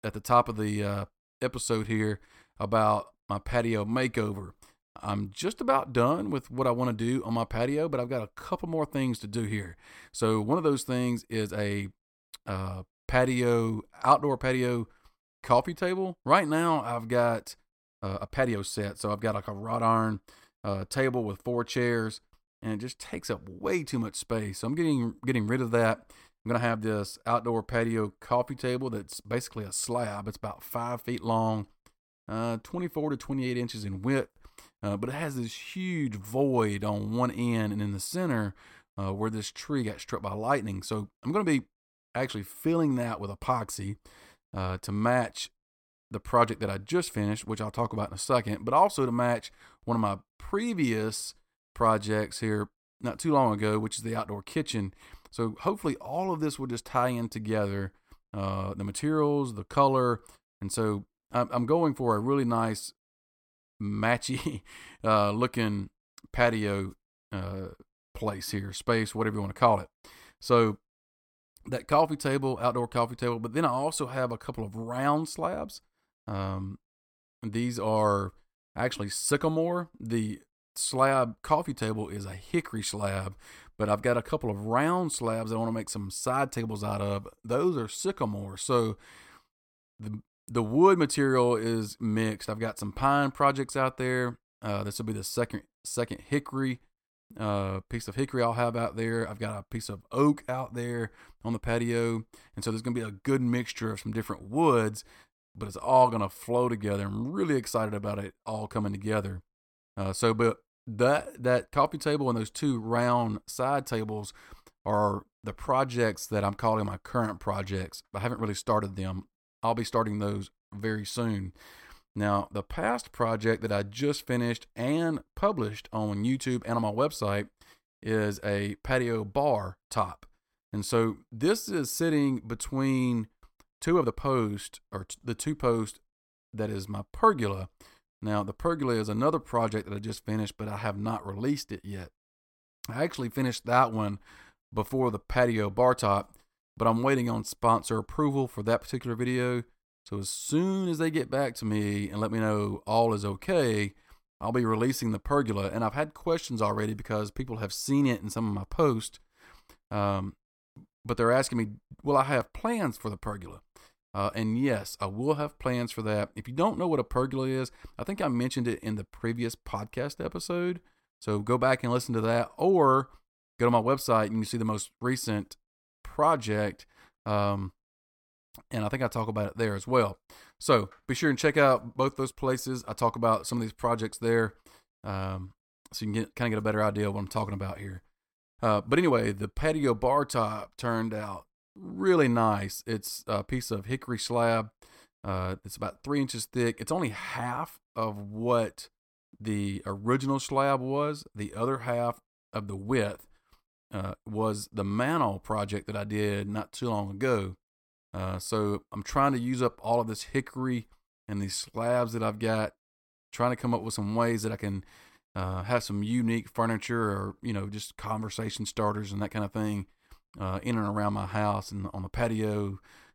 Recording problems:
uneven, jittery; strongly; from 18 s to 3:32

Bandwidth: 17 kHz